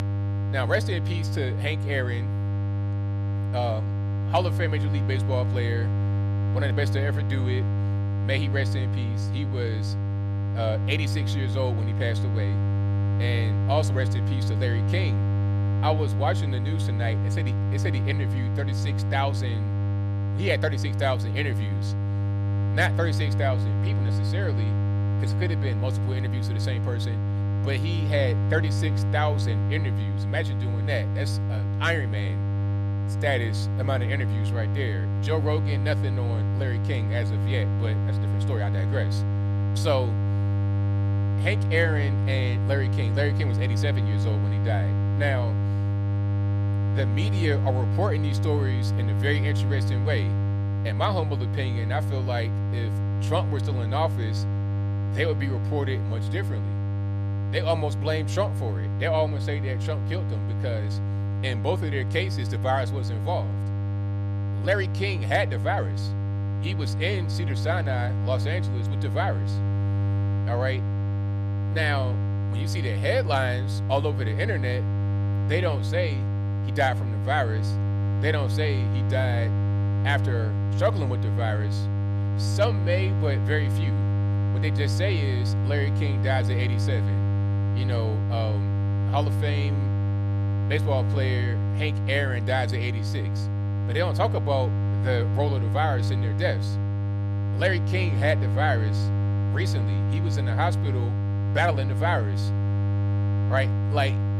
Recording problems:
electrical hum; loud; throughout; 50 Hz, 7 dB below the speech

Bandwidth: 14 kHz